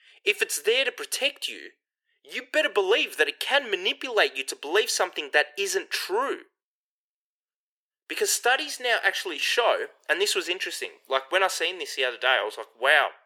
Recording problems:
thin; very; fading below 400 Hz

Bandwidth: 18.5 kHz